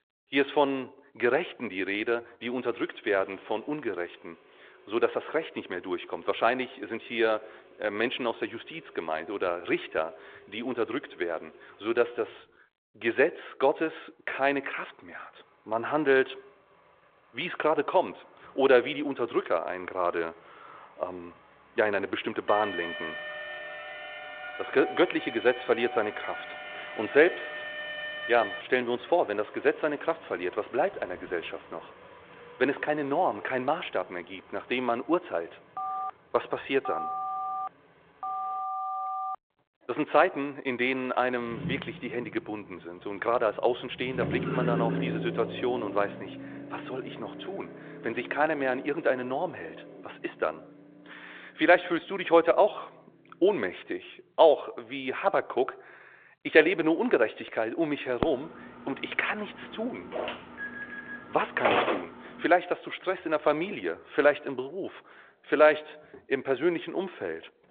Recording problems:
phone-call audio; nothing above 3.5 kHz
traffic noise; noticeable; throughout; 15 dB below the speech
alarm; noticeable; from 22 to 29 s; peak 6 dB below the speech
phone ringing; noticeable; from 36 to 39 s; peak 4 dB below the speech
phone ringing; loud; from 58 s to 1:02; peak 3 dB above the speech

